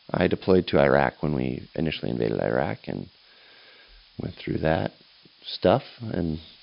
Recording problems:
high frequencies cut off; noticeable; nothing above 5.5 kHz
hiss; faint; throughout; 30 dB below the speech

